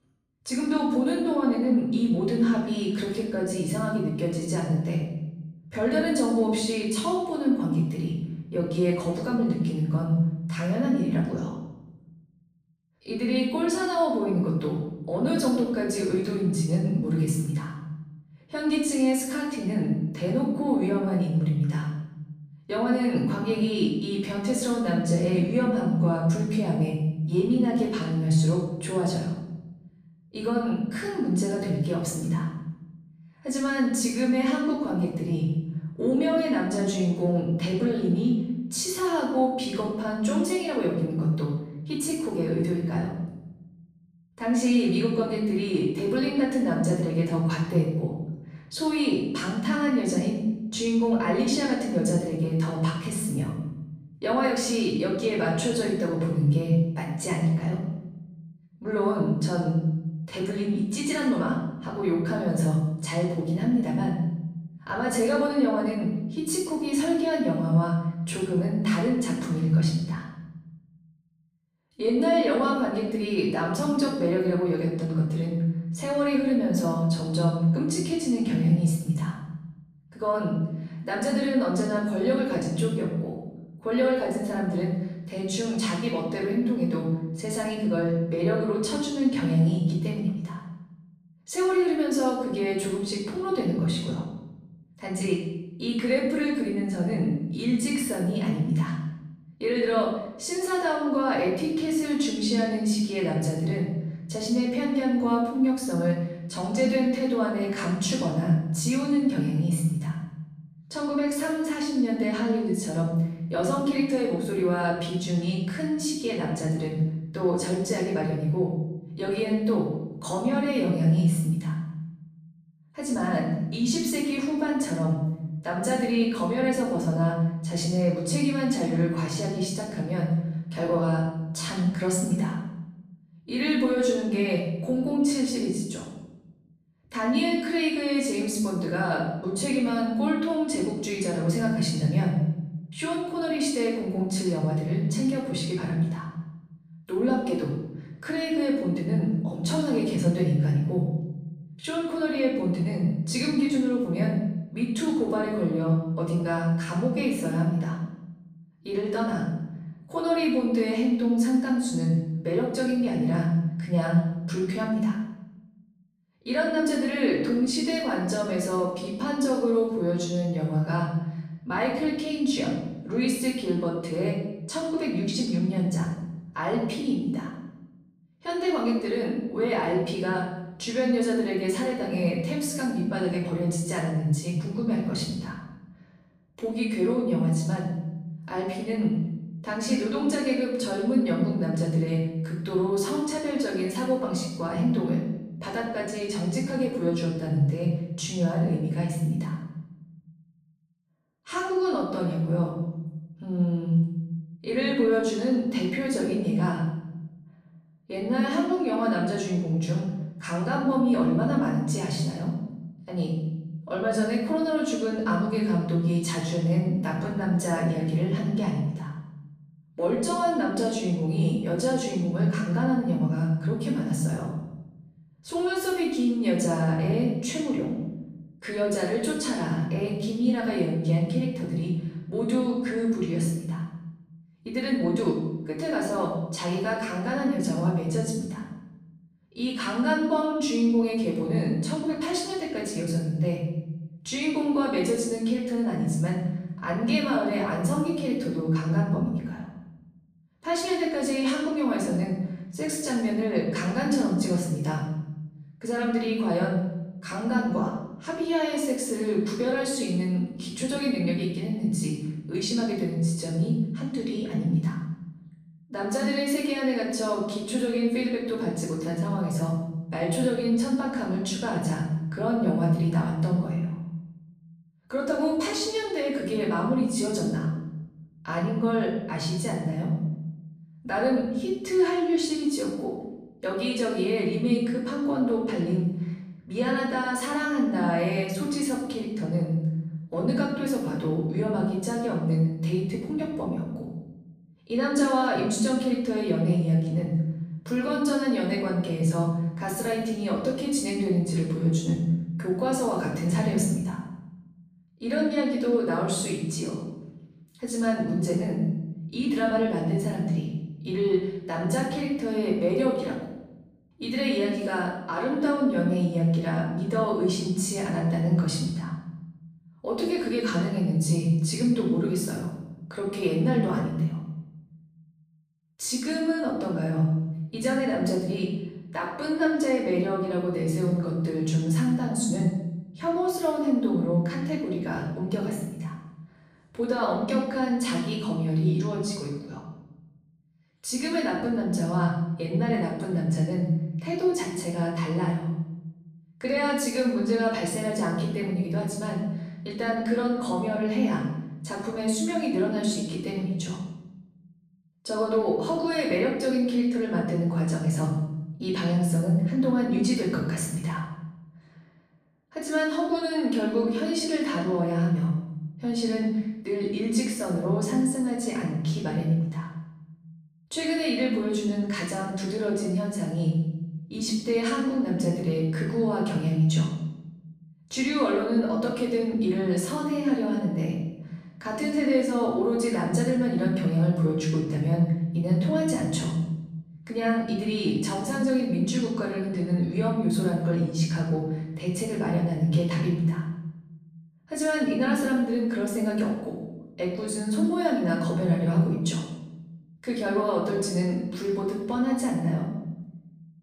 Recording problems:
off-mic speech; far
room echo; noticeable; dies away in 1 s

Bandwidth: 15 kHz